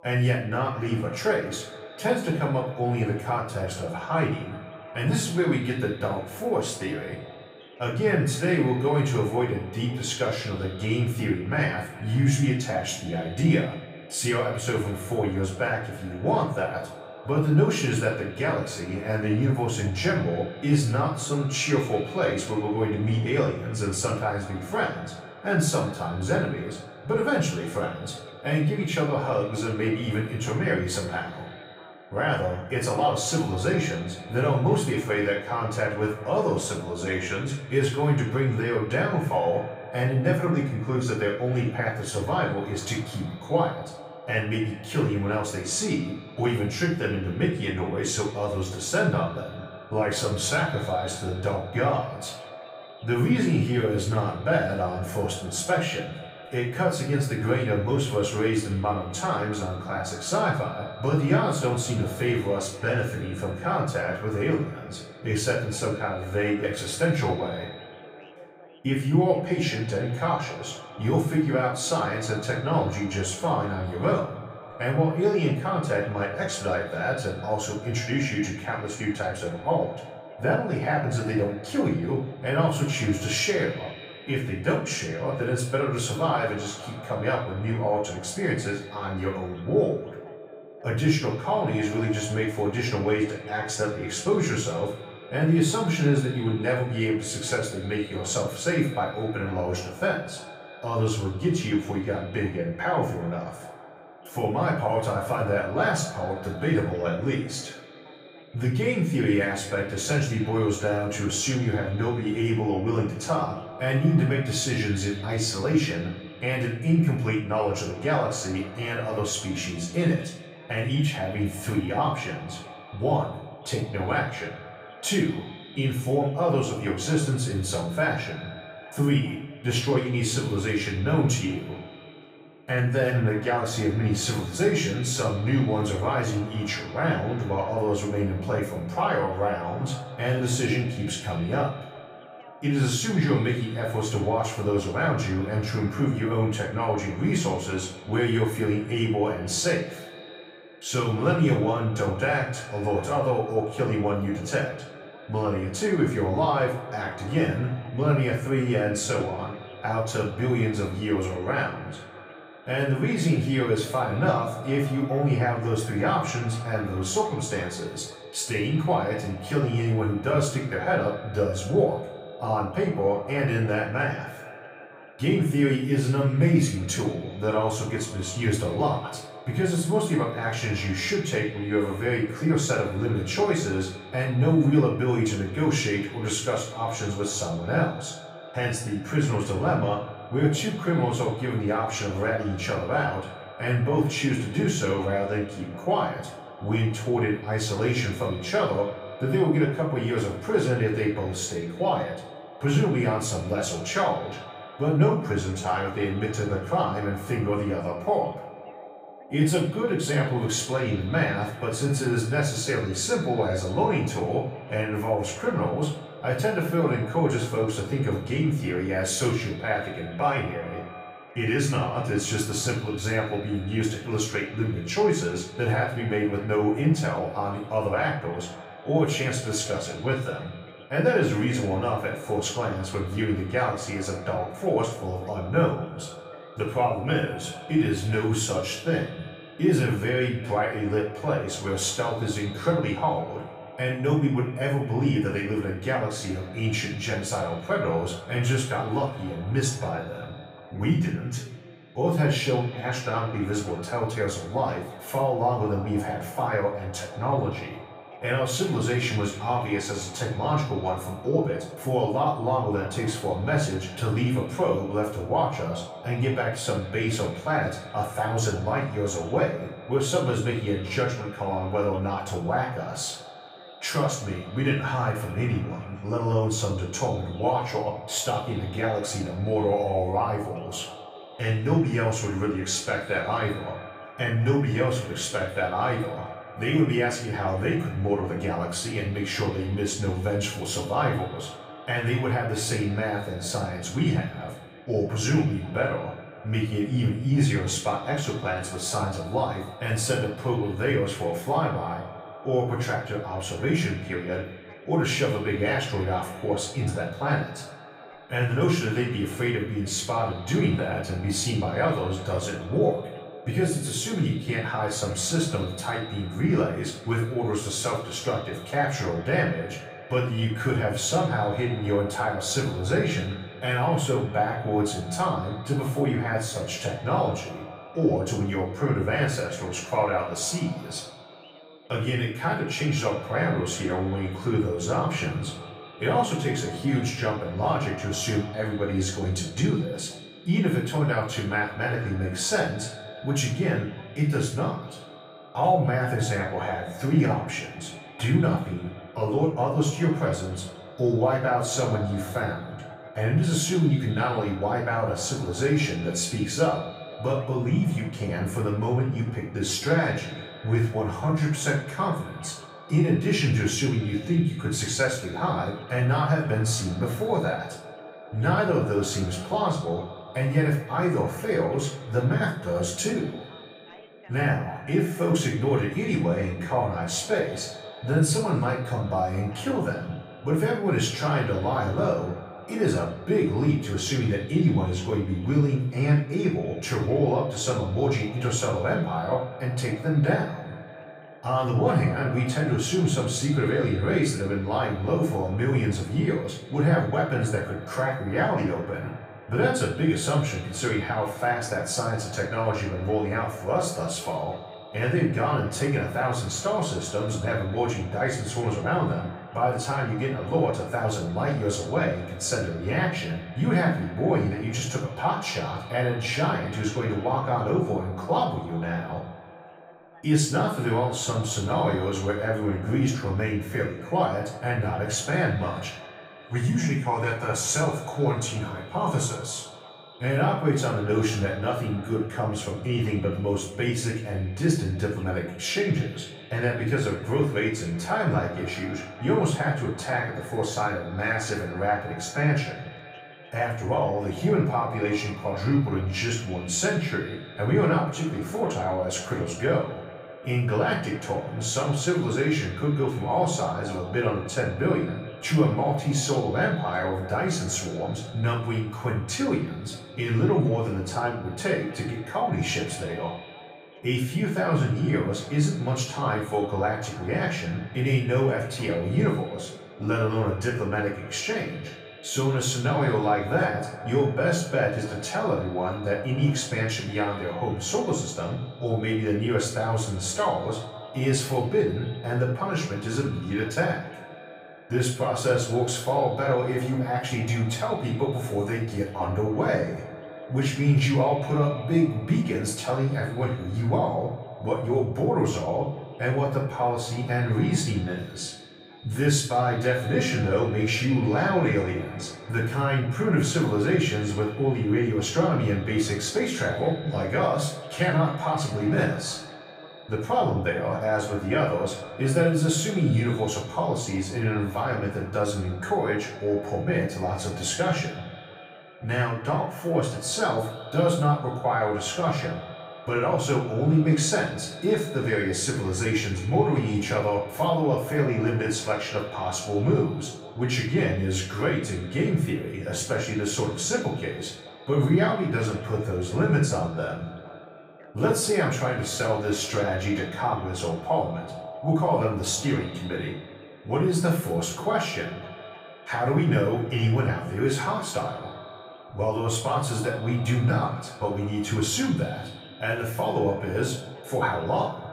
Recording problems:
off-mic speech; far
echo of what is said; noticeable; throughout; 180 ms later, 15 dB below the speech
room echo; noticeable; dies away in 0.4 s
voice in the background; faint; throughout; 30 dB below the speech

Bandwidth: 15.5 kHz